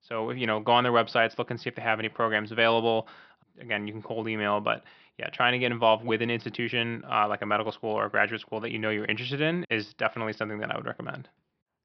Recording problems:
high frequencies cut off; noticeable; nothing above 5.5 kHz

